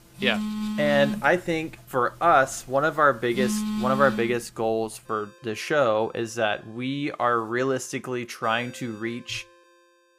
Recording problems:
alarms or sirens; loud; throughout; 5 dB below the speech

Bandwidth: 15 kHz